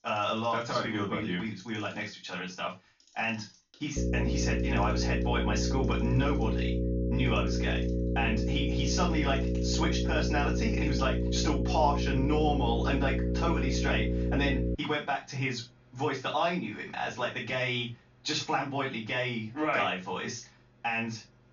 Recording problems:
off-mic speech; far
high frequencies cut off; noticeable; nothing above 7 kHz
room echo; slight; dies away in 0.2 s
electrical hum; loud; from 4 to 15 s; 60 Hz, 5 dB below the speech
household noises; faint; throughout; 25 dB below the speech

